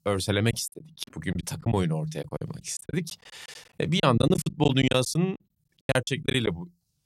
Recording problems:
choppy; very; 15% of the speech affected

